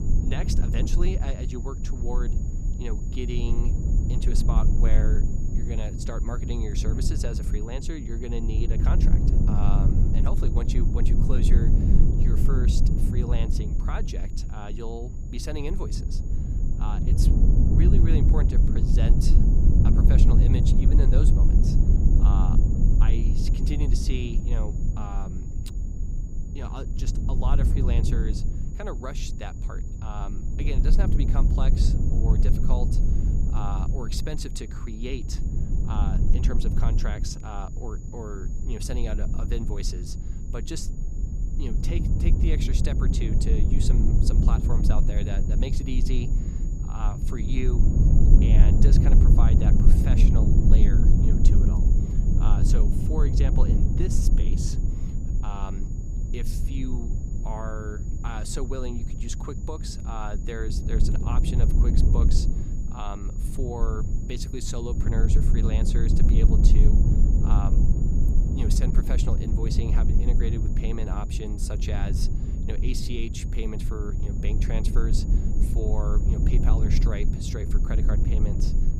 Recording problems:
low rumble; loud; throughout; as loud as the speech
high-pitched whine; noticeable; throughout; 7 kHz, 15 dB below the speech

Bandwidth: 15.5 kHz